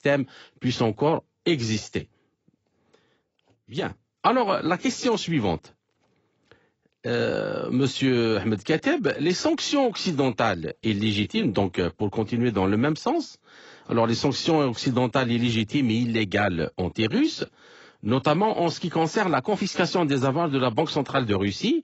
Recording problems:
garbled, watery; badly; nothing above 7.5 kHz

